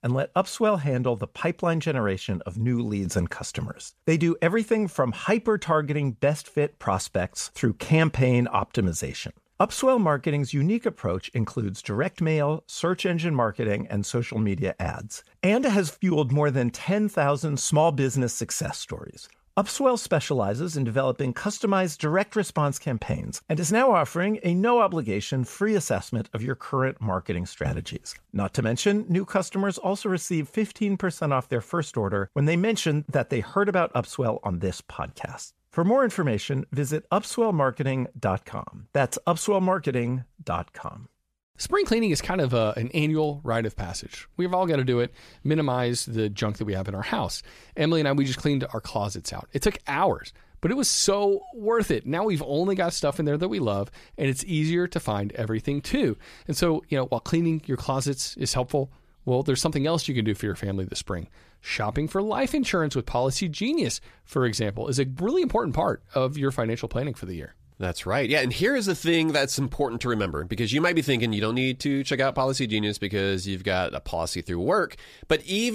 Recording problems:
abrupt cut into speech; at the end

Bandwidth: 14.5 kHz